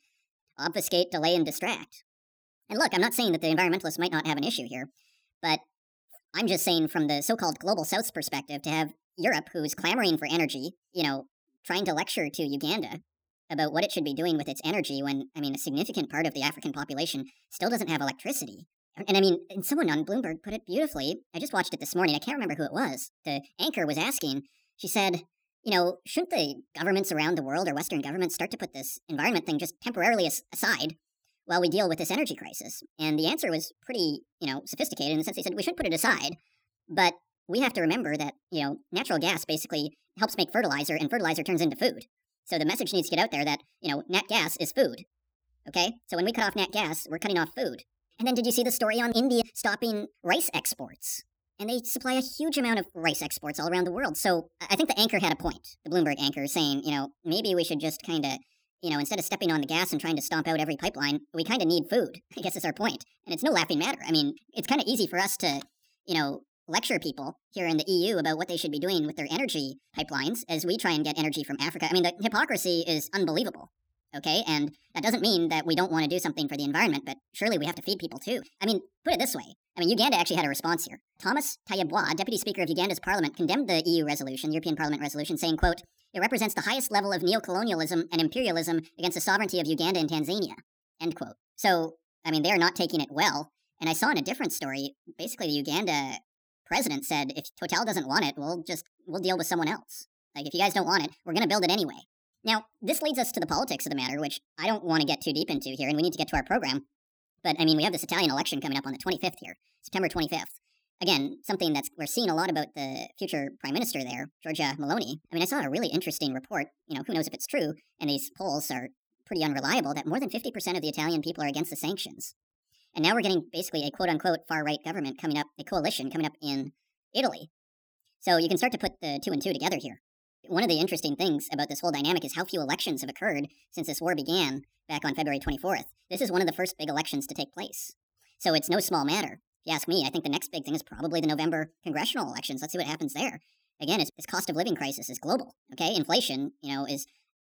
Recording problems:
wrong speed and pitch; too fast and too high; 1.5 times normal speed

